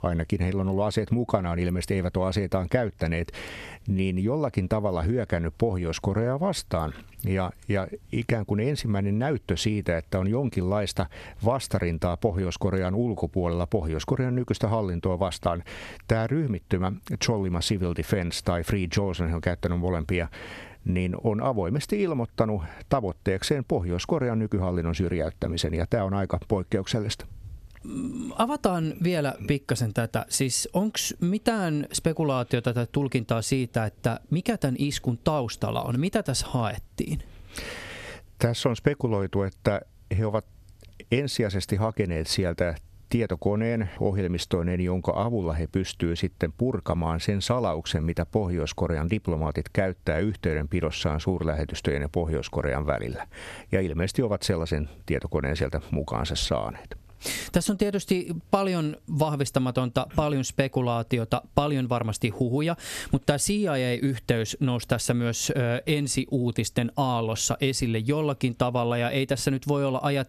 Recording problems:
squashed, flat; somewhat

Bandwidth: 13.5 kHz